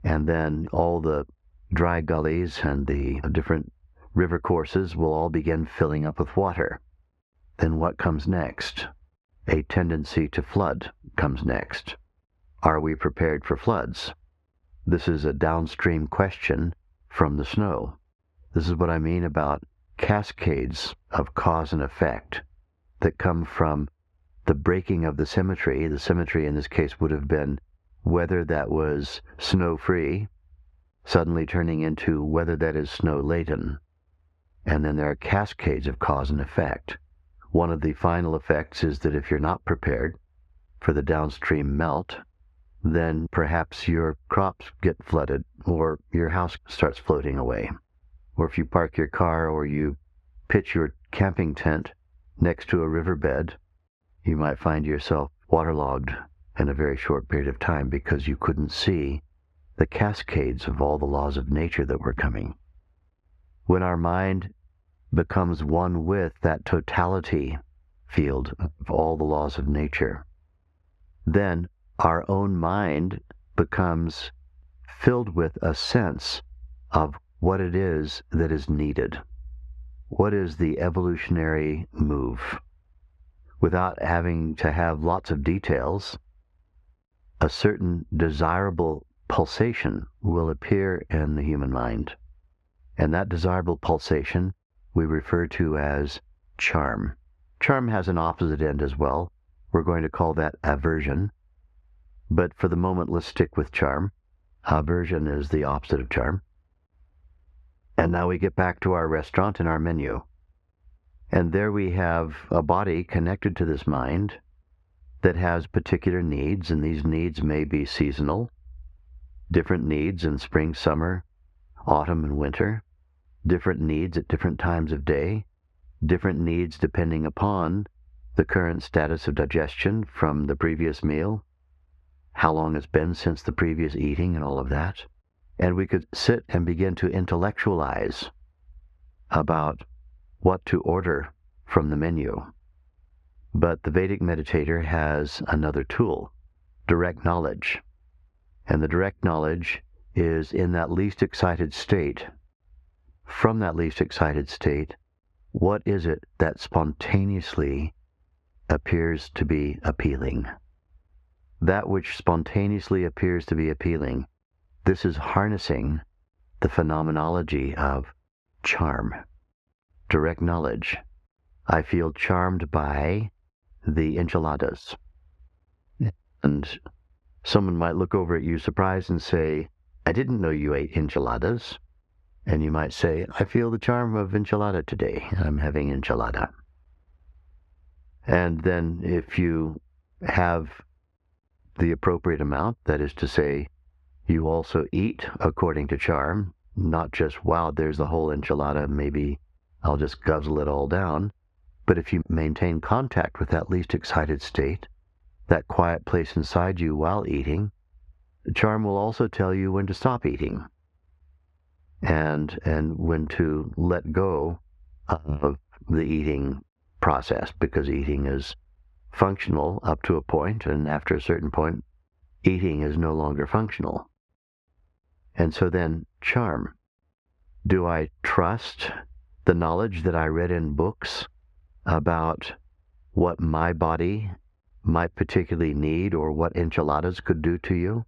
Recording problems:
muffled; very slightly; fading above 2 kHz
squashed, flat; somewhat

